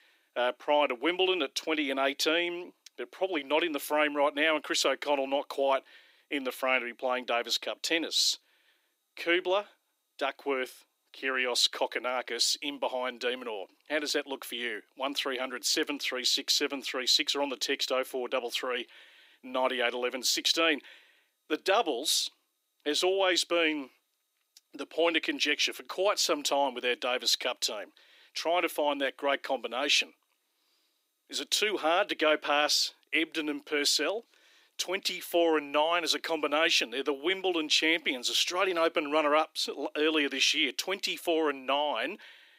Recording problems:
thin; somewhat; fading below 300 Hz

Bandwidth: 15.5 kHz